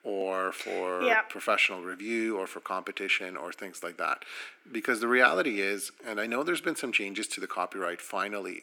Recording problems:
thin; somewhat; fading below 250 Hz

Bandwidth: 19 kHz